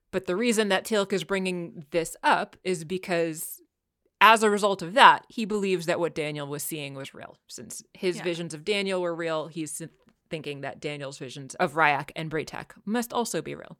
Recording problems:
none

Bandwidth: 17 kHz